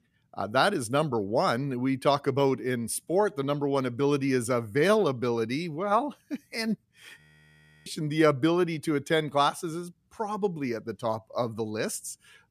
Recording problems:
audio freezing; at 7 s for 0.5 s

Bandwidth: 14.5 kHz